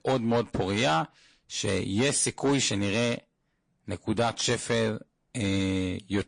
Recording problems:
distortion; slight; 10 dB below the speech
garbled, watery; slightly; nothing above 10 kHz

